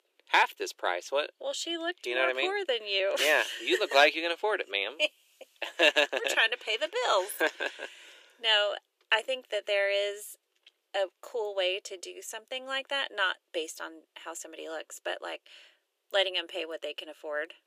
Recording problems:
thin; very; fading below 350 Hz

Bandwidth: 14.5 kHz